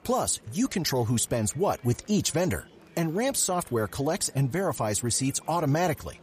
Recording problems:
murmuring crowd; faint; throughout; 25 dB below the speech

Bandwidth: 14.5 kHz